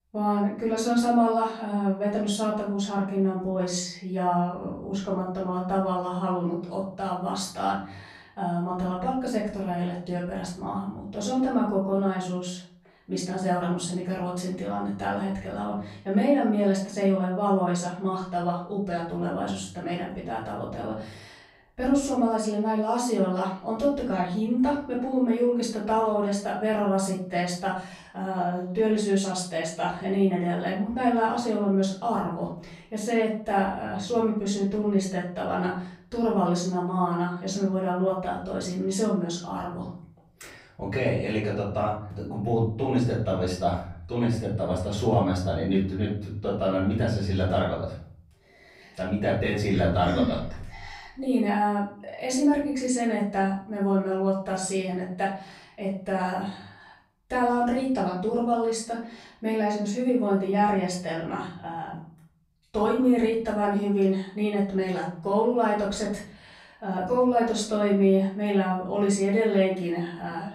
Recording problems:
off-mic speech; far
room echo; noticeable; dies away in 0.8 s

